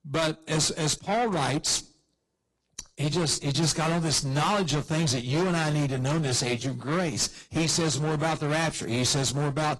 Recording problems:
distortion; heavy; 22% of the sound clipped
garbled, watery; slightly; nothing above 11 kHz

